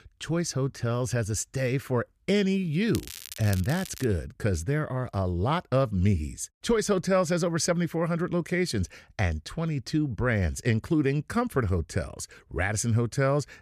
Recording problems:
crackling; noticeable; from 3 to 4 s; 15 dB below the speech

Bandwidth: 14.5 kHz